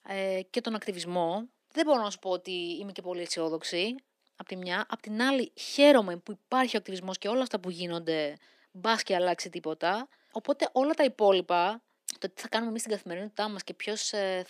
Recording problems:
thin; somewhat; fading below 300 Hz

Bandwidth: 14.5 kHz